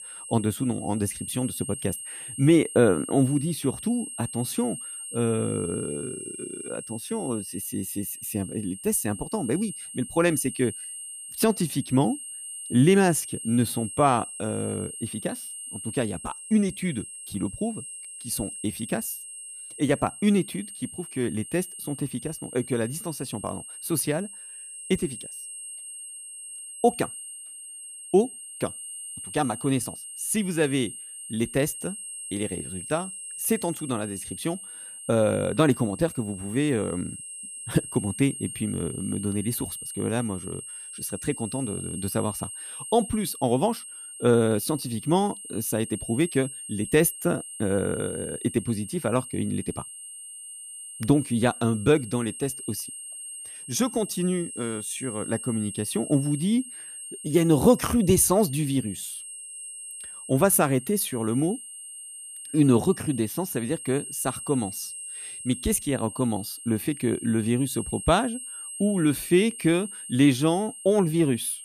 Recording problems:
high-pitched whine; noticeable; throughout; 8.5 kHz, 10 dB below the speech

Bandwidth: 14.5 kHz